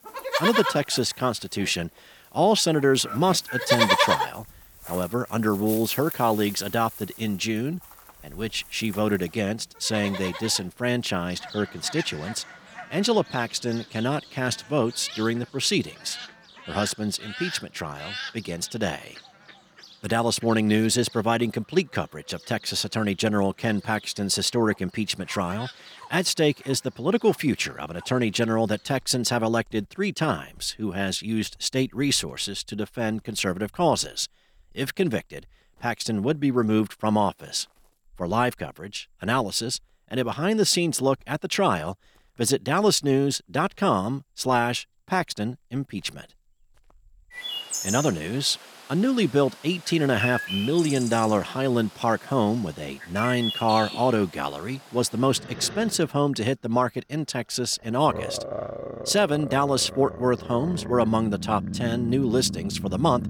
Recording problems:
animal sounds; loud; throughout; 7 dB below the speech

